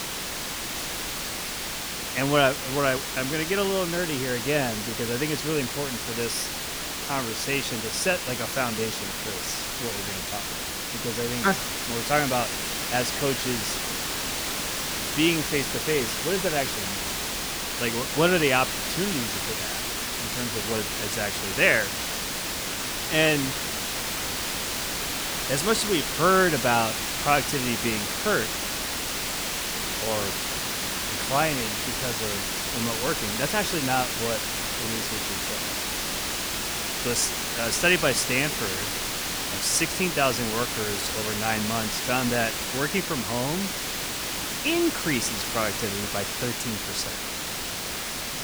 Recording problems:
hiss; loud; throughout; 1 dB below the speech

